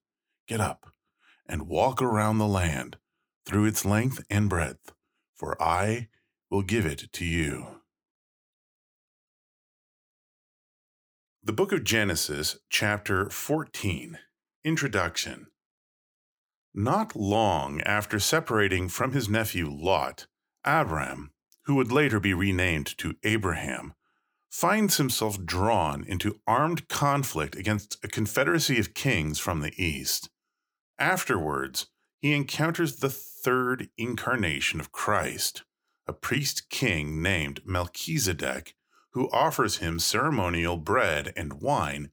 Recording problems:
none

